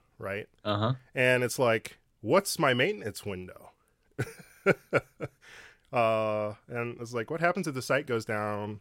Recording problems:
none

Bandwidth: 16 kHz